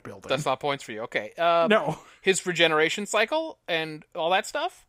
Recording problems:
none

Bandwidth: 15.5 kHz